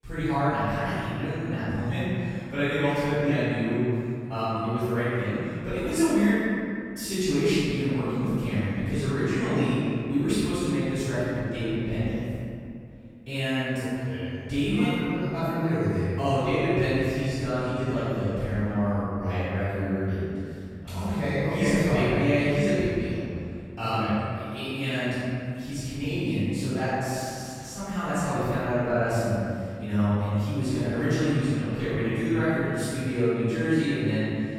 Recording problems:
room echo; strong; dies away in 2.3 s
off-mic speech; far

